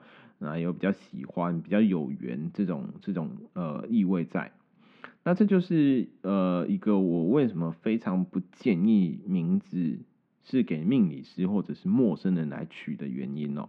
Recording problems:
muffled; very; fading above 2.5 kHz

